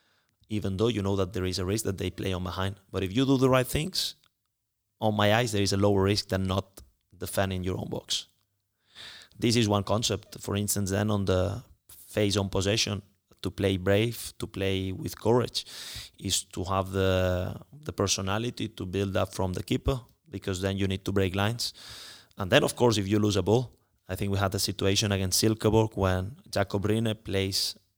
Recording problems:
none

